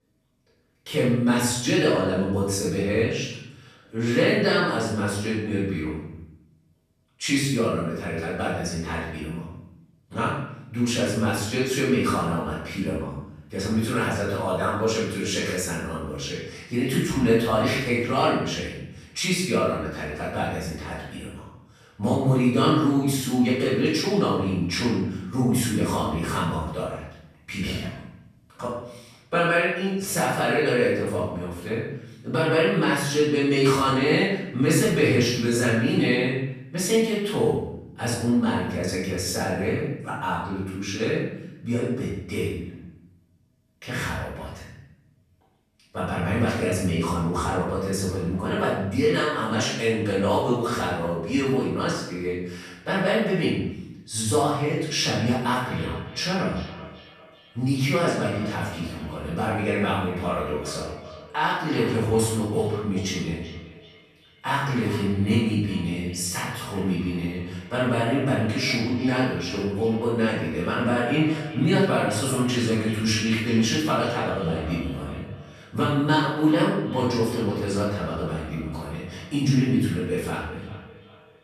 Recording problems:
room echo; strong; dies away in 0.7 s
off-mic speech; far
echo of what is said; noticeable; from 56 s on; 380 ms later, 15 dB below the speech

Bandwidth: 14.5 kHz